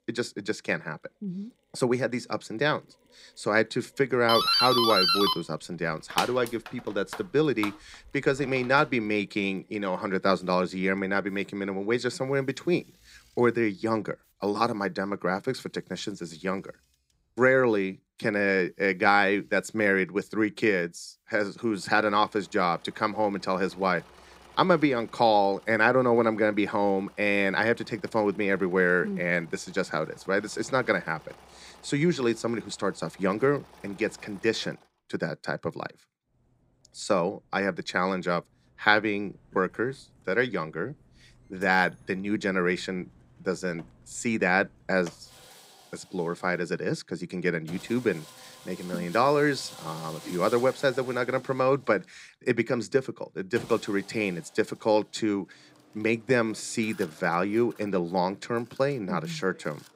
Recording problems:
machinery noise; faint; throughout; 25 dB below the speech
doorbell; loud; from 4.5 to 9 s; peak 6 dB above the speech

